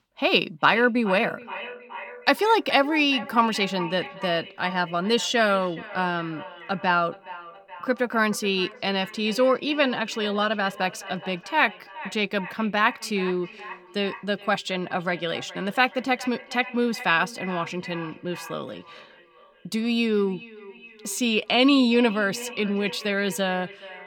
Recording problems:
echo of what is said; noticeable; throughout; 420 ms later, 15 dB below the speech

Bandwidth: 18 kHz